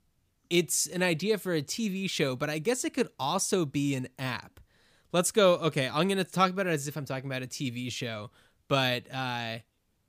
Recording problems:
none

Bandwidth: 15 kHz